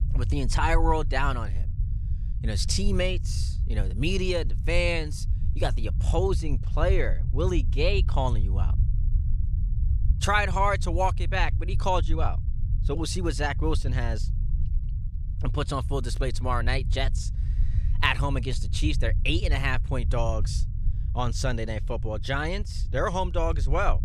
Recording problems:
low rumble; noticeable; throughout; 20 dB below the speech

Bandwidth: 14.5 kHz